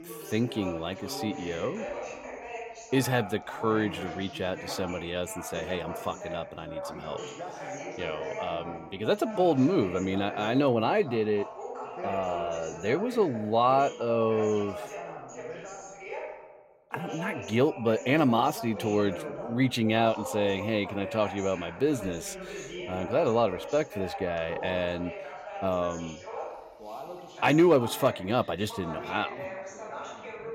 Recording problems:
background chatter; noticeable; throughout; 2 voices, 10 dB below the speech

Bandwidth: 16 kHz